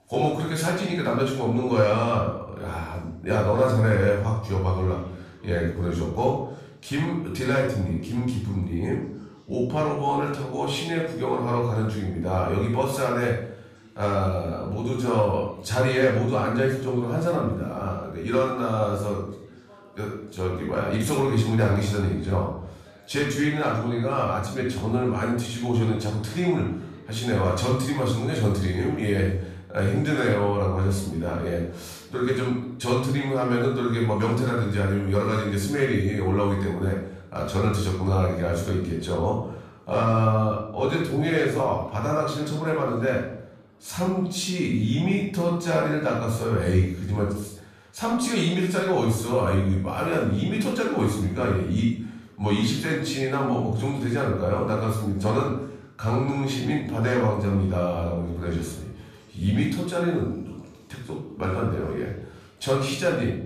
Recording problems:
off-mic speech; far
room echo; noticeable; dies away in 0.6 s
voice in the background; faint; throughout; 25 dB below the speech

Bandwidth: 14.5 kHz